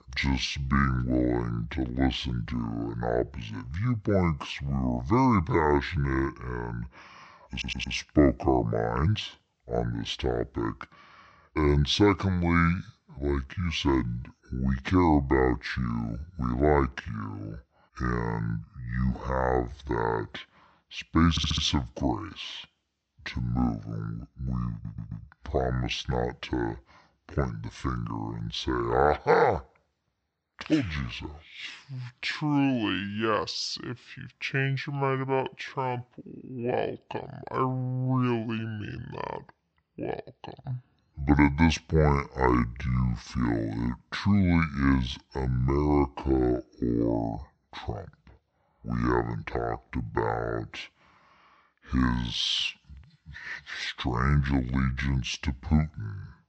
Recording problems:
wrong speed and pitch; too slow and too low; 0.6 times normal speed
high frequencies cut off; noticeable; nothing above 8 kHz
audio stuttering; at 7.5 s, at 21 s and at 25 s

